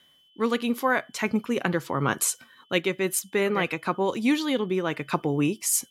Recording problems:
high-pitched whine; faint; throughout; 3 kHz, 35 dB below the speech

